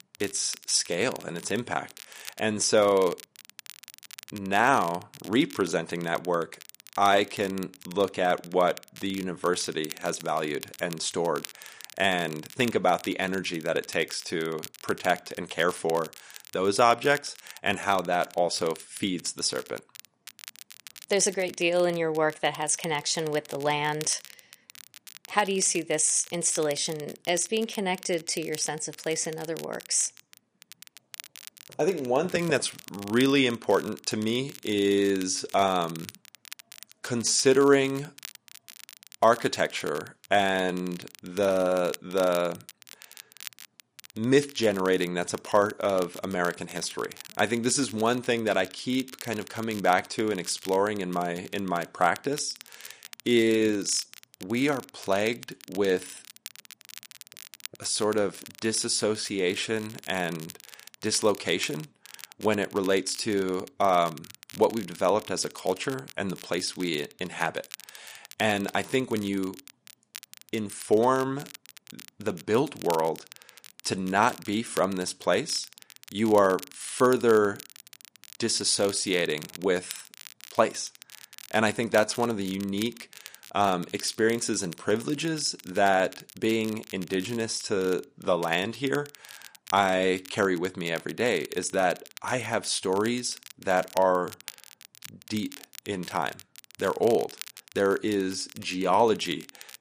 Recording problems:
garbled, watery; slightly; nothing above 10.5 kHz
crackle, like an old record; noticeable; 20 dB below the speech

